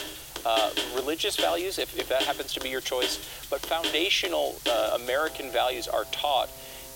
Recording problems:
thin; very; fading below 300 Hz
background music; loud; throughout; 6 dB below the speech
hiss; noticeable; throughout; 15 dB below the speech

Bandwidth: 16.5 kHz